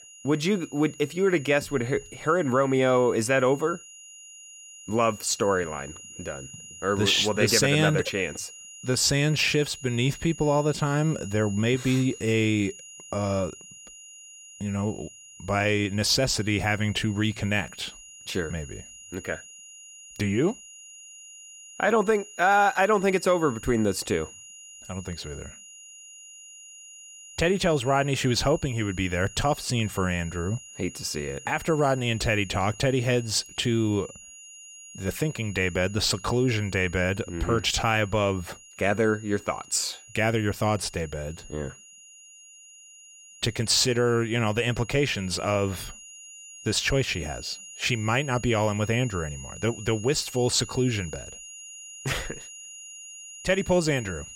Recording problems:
high-pitched whine; noticeable; throughout; 7 kHz, 15 dB below the speech

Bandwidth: 16 kHz